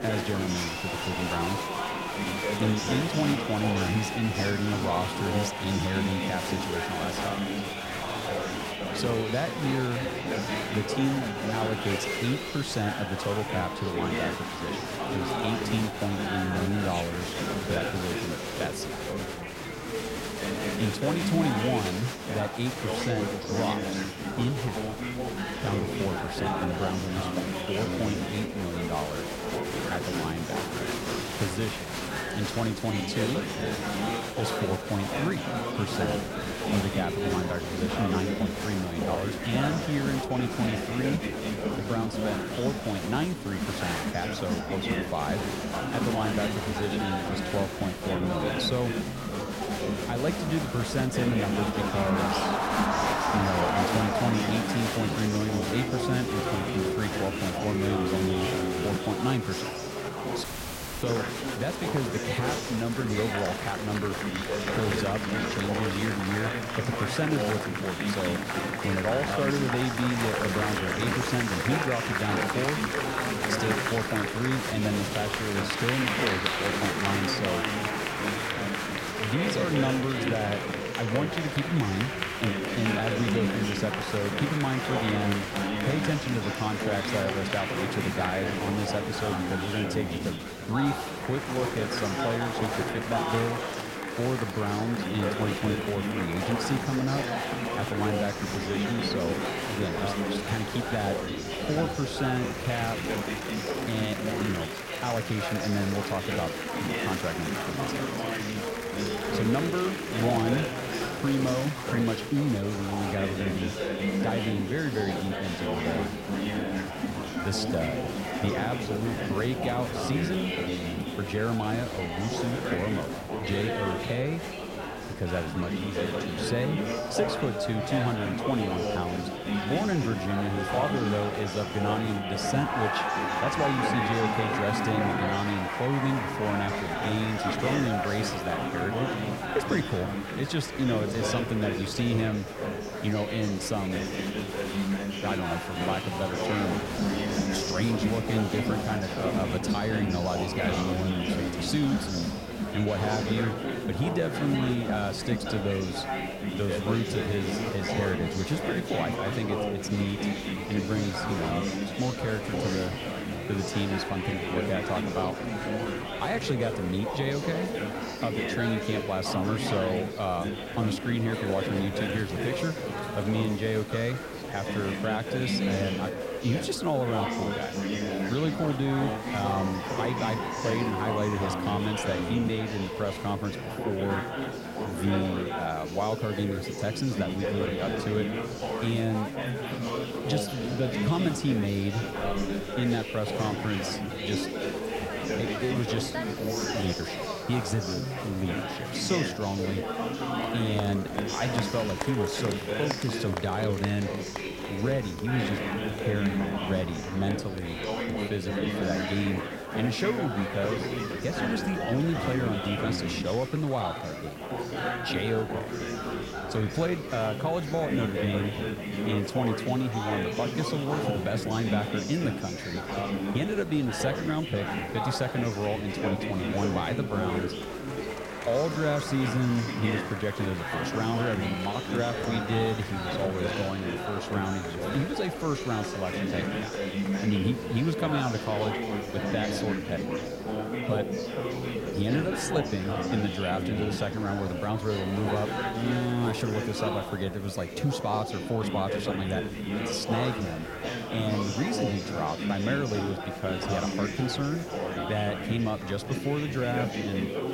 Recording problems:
murmuring crowd; loud; throughout; as loud as the speech
wind noise on the microphone; occasional gusts; 20 dB below the speech
hiss; faint; throughout; 25 dB below the speech
audio cutting out; at 1:00 for 0.5 s

